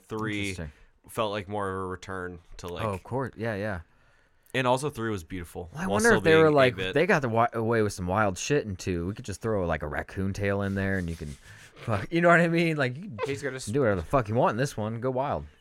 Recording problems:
none

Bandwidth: 16 kHz